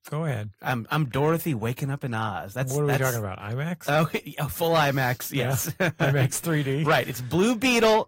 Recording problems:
distortion; slight; 10 dB below the speech
garbled, watery; slightly; nothing above 16 kHz

